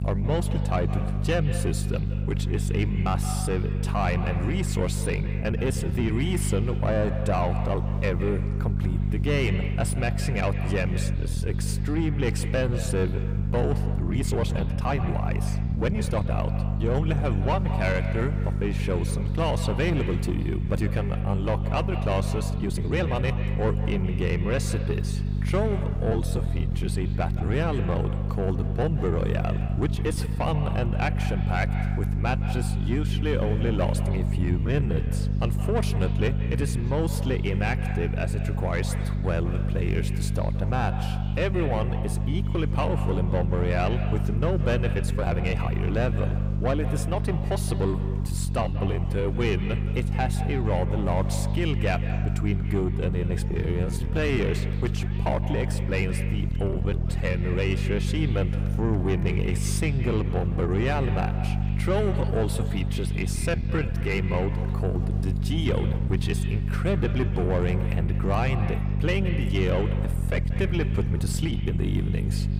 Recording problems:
echo of what is said; noticeable; throughout; 160 ms later, 10 dB below the speech
distortion; slight; 10 dB below the speech
electrical hum; loud; throughout; 50 Hz, 9 dB below the speech
murmuring crowd; faint; throughout; 25 dB below the speech
uneven, jittery; strongly; from 5.5 s to 1:12

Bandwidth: 15.5 kHz